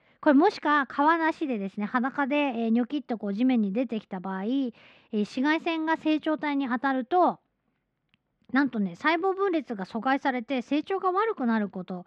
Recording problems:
muffled; slightly; fading above 2 kHz

